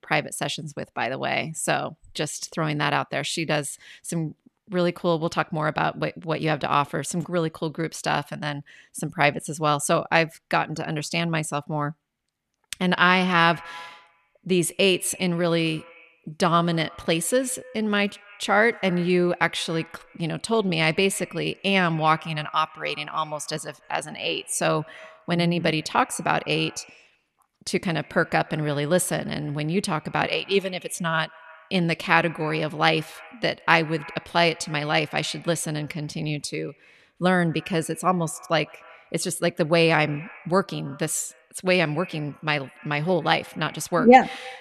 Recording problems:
echo of what is said; faint; from 13 s on; 140 ms later, 20 dB below the speech

